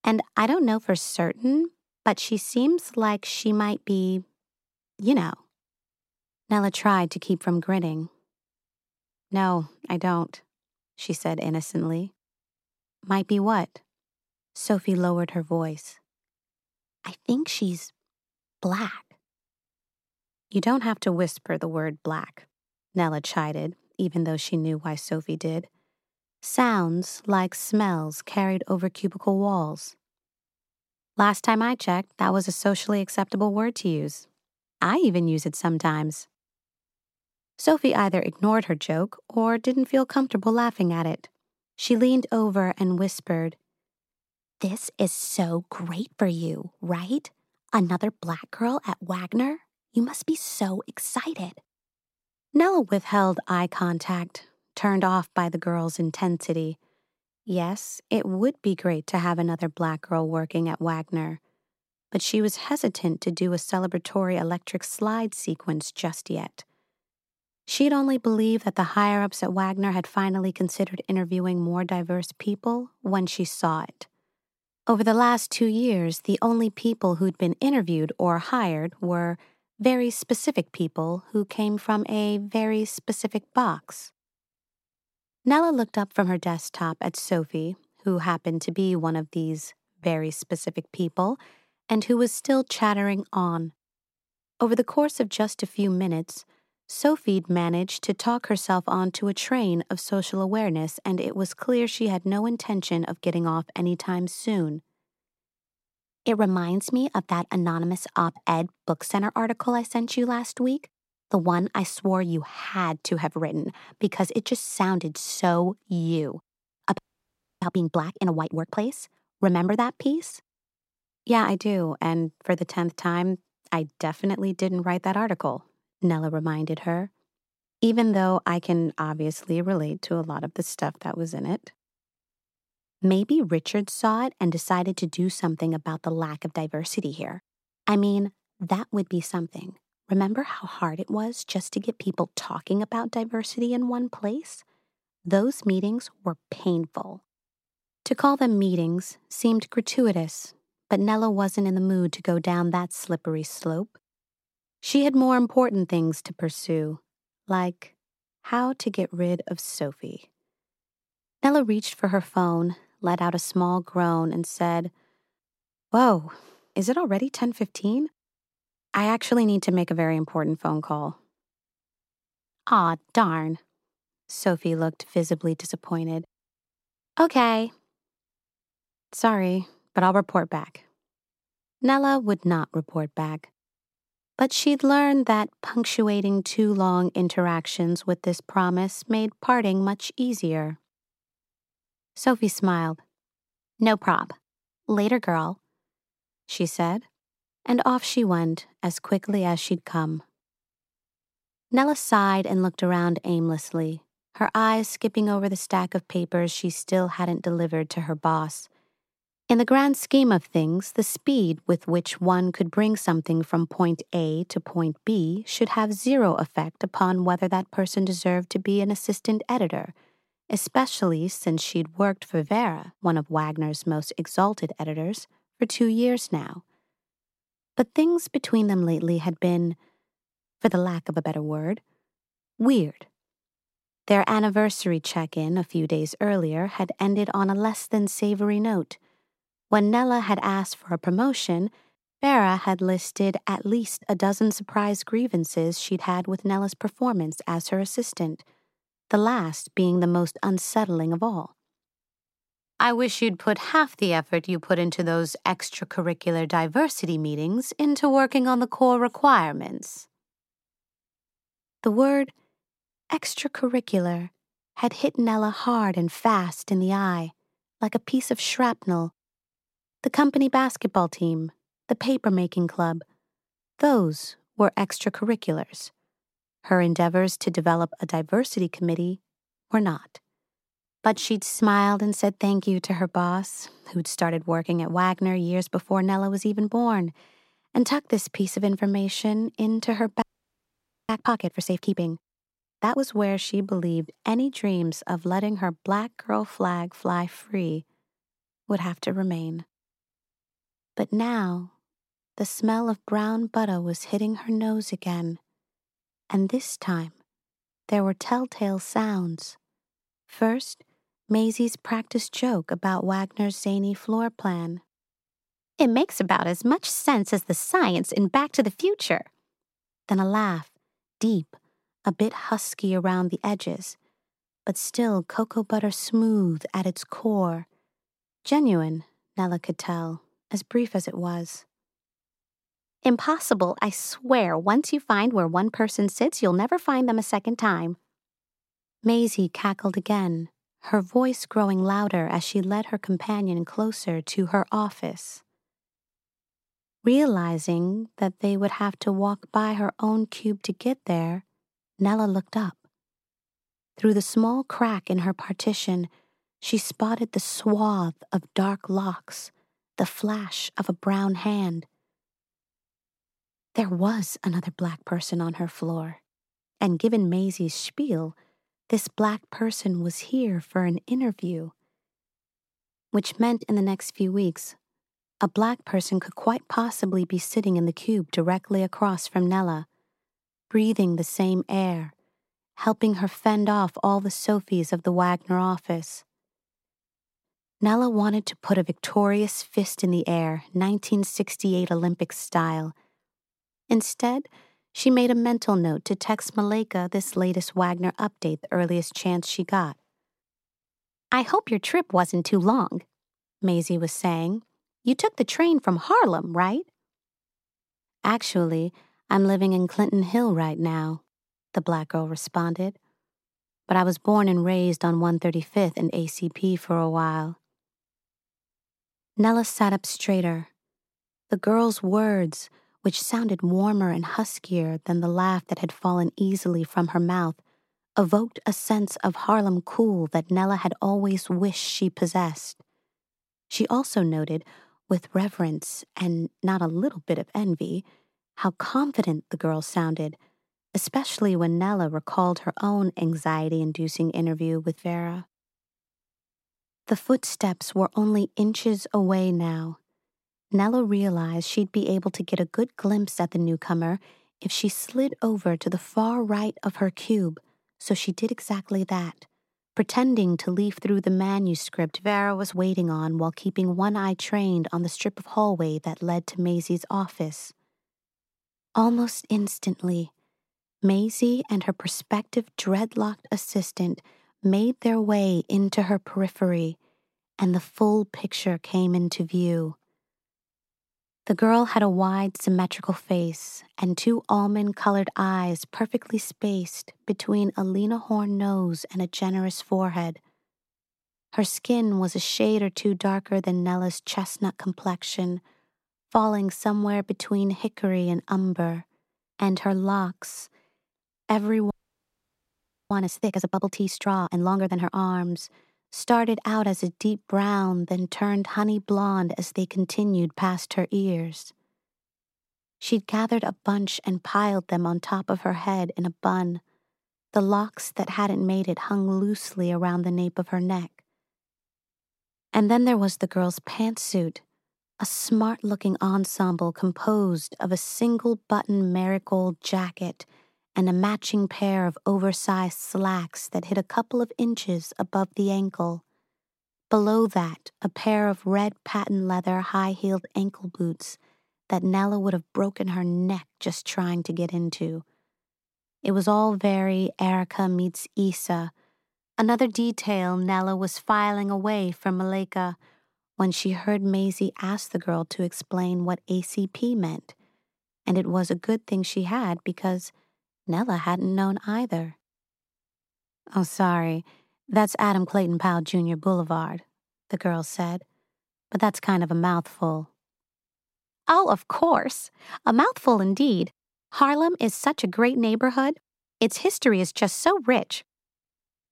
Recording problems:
audio freezing; at 1:57 for 0.5 s, at 4:50 for 1 s and at 8:22 for 1 s

